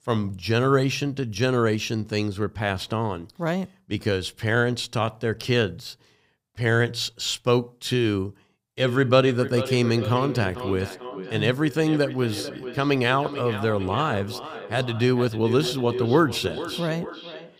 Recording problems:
echo of what is said; strong; from 9 s on; 440 ms later, 10 dB below the speech

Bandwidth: 15.5 kHz